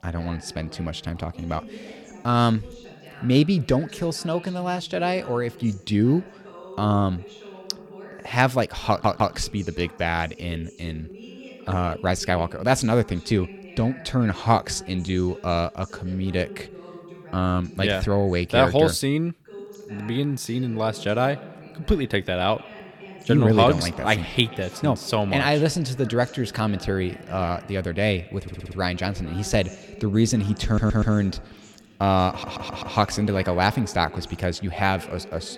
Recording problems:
echo of what is said; faint; from 21 s on; 130 ms later, 20 dB below the speech
voice in the background; noticeable; throughout; 20 dB below the speech
audio stuttering; 4 times, first at 9 s

